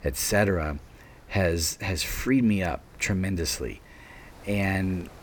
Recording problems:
wind noise on the microphone; occasional gusts; 25 dB below the speech

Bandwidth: 18.5 kHz